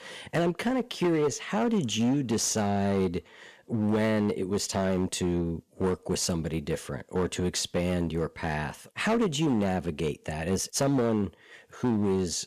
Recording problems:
distortion; slight; 11% of the sound clipped

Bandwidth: 14.5 kHz